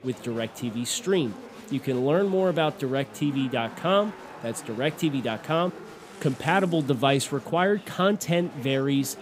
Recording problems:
chatter from many people; noticeable; throughout; 15 dB below the speech
rain or running water; faint; throughout; 30 dB below the speech

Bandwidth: 15.5 kHz